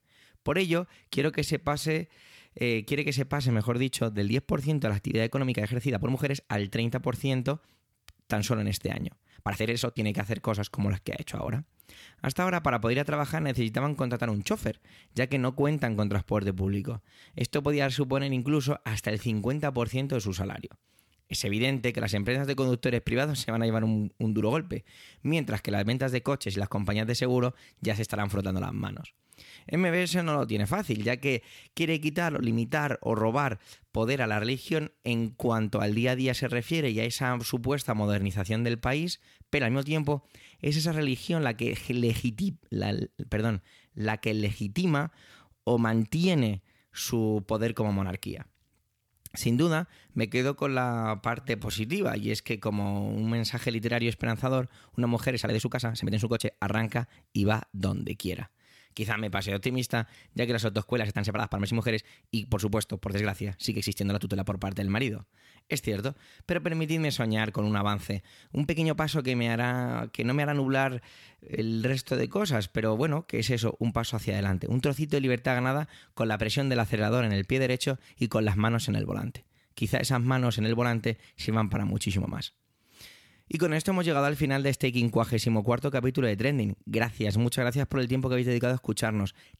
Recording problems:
uneven, jittery; strongly; from 1 s to 1:22

